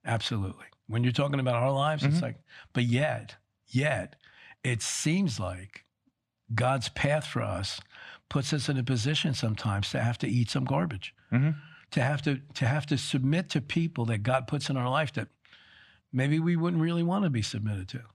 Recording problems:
none

